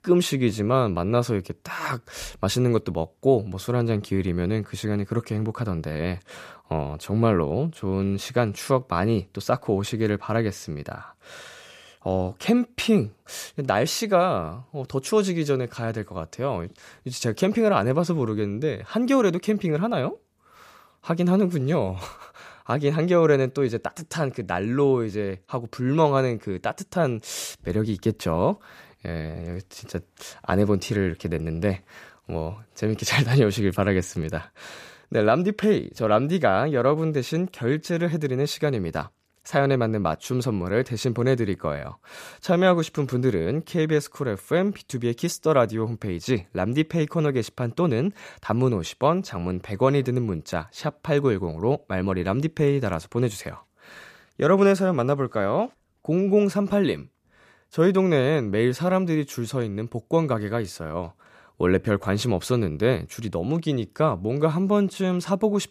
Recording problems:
none

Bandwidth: 14.5 kHz